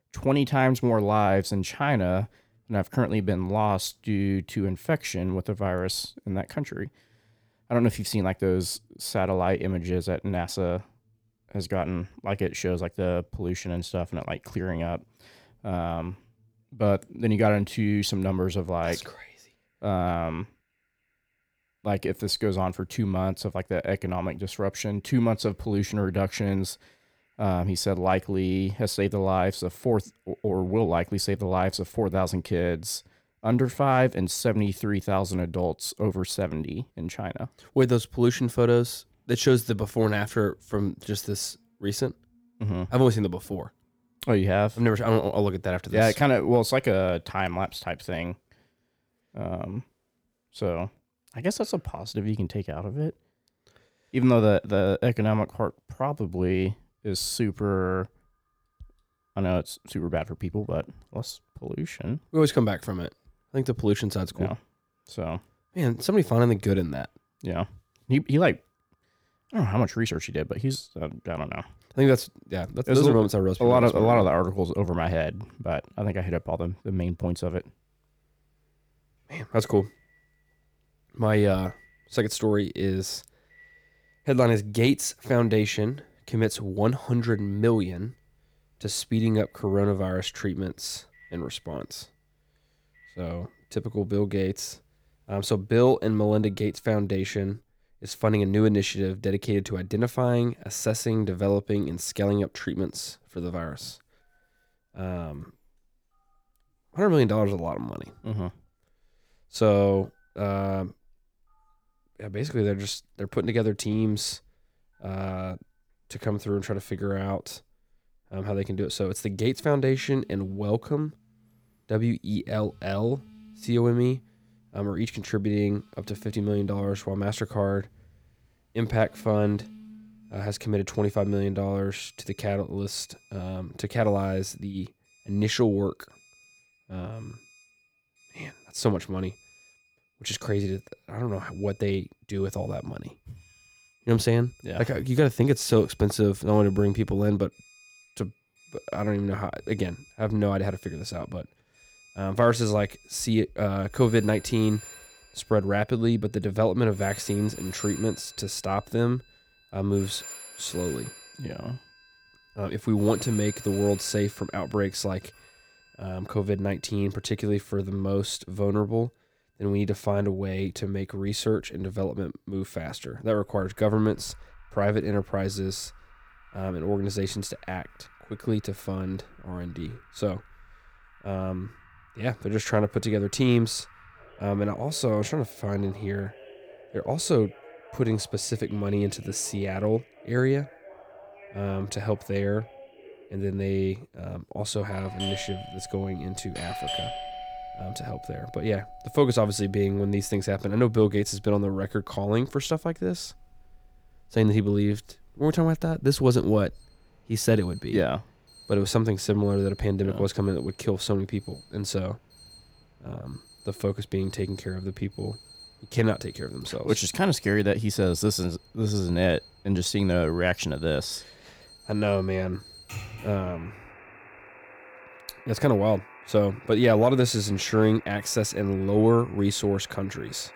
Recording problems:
alarms or sirens; noticeable; throughout; 20 dB below the speech

